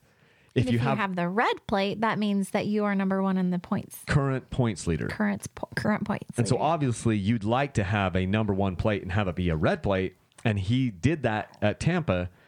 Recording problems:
squashed, flat; somewhat

